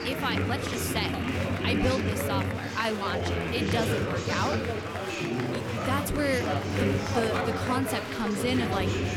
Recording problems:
chatter from many people; very loud; throughout; 2 dB above the speech

